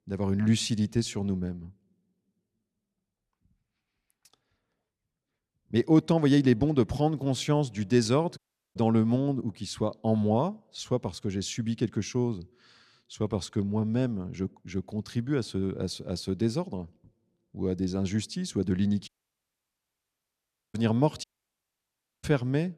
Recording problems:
audio cutting out; at 8.5 s, at 19 s for 1.5 s and at 21 s for 1 s

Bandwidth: 14.5 kHz